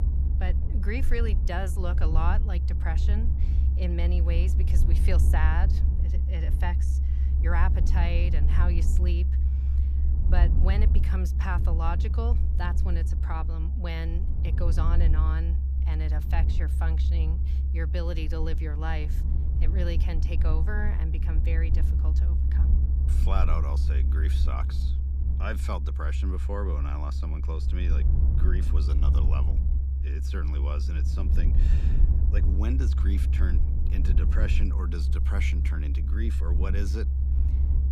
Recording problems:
low rumble; loud; throughout; 6 dB below the speech

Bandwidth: 15 kHz